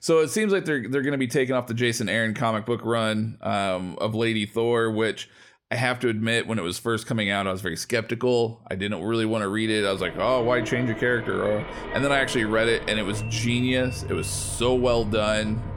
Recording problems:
traffic noise; noticeable; from 10 s on; 10 dB below the speech

